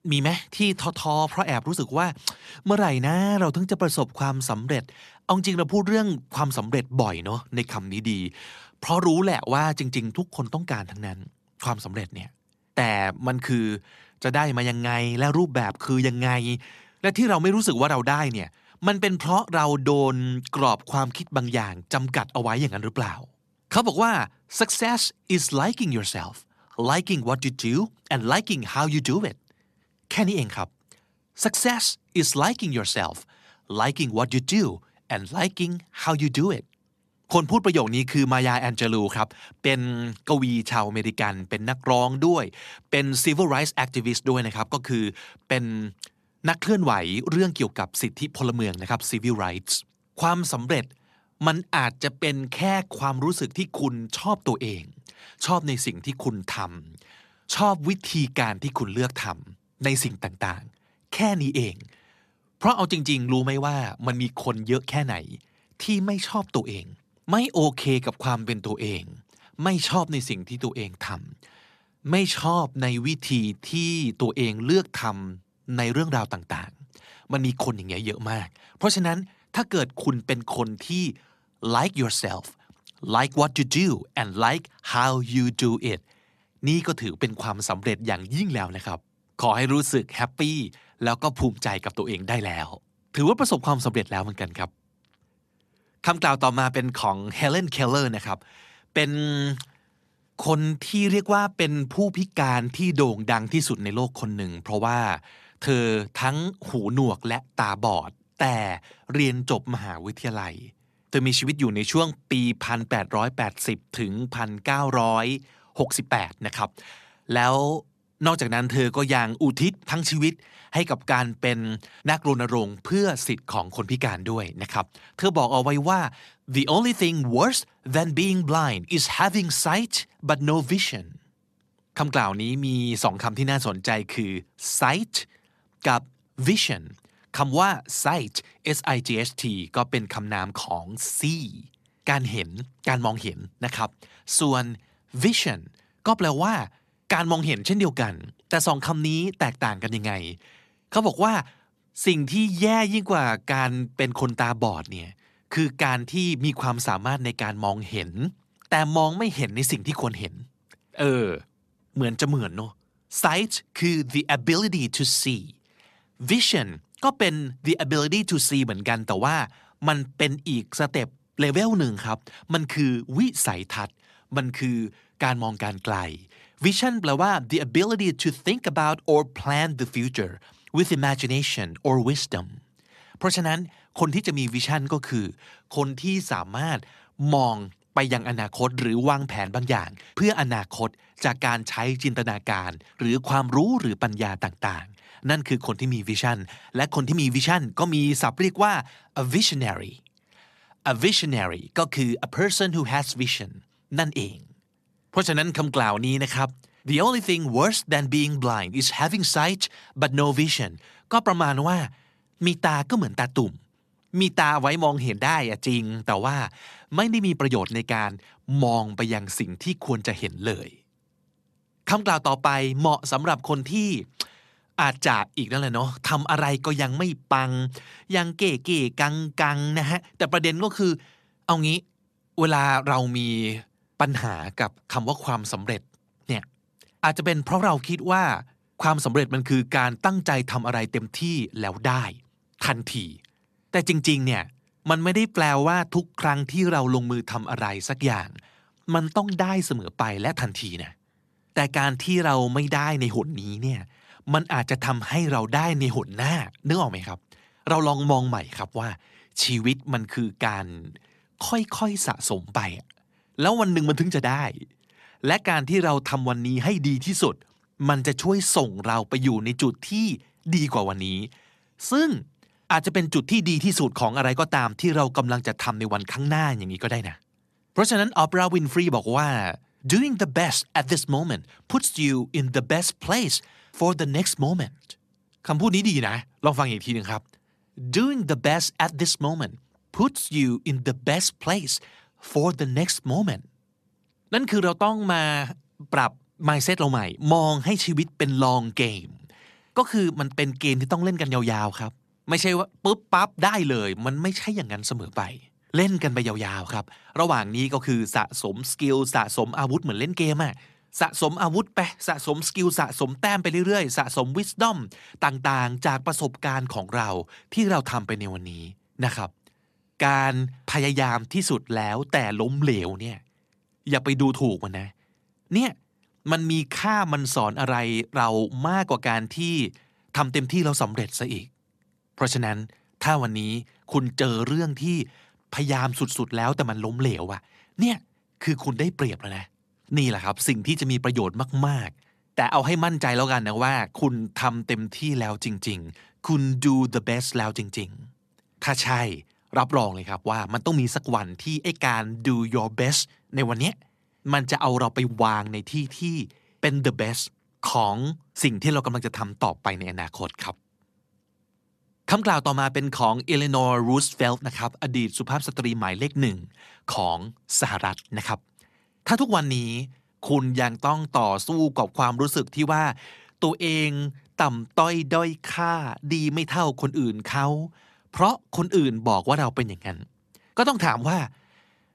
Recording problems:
uneven, jittery; slightly; from 1.5 s to 5:58

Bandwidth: 13.5 kHz